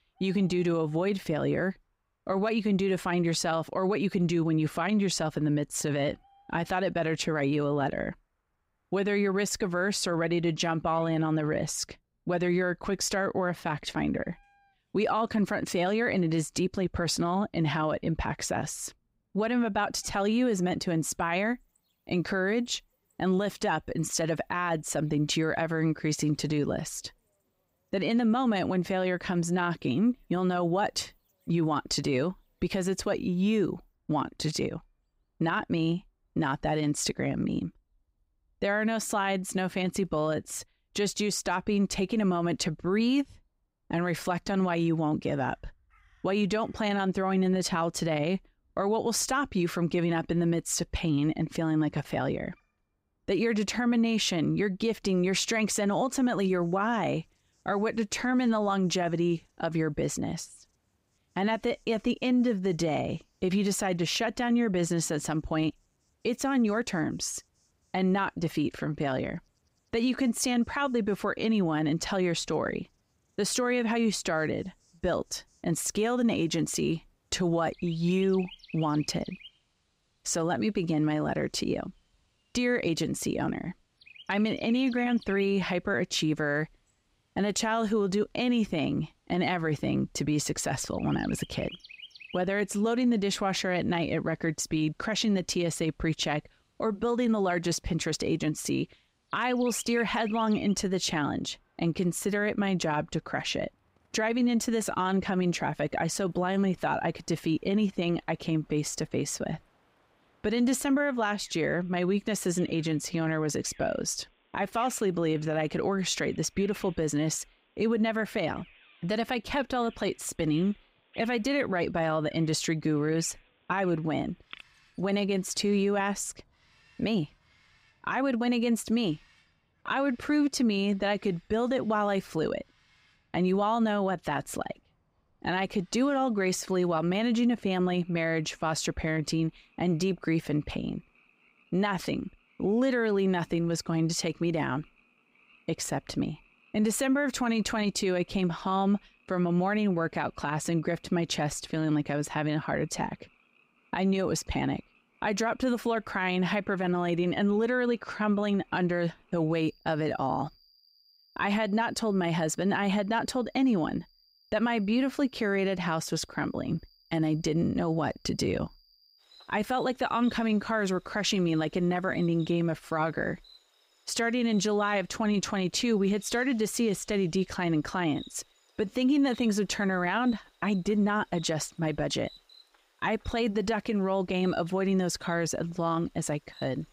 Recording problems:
animal sounds; faint; throughout; 25 dB below the speech

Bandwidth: 15.5 kHz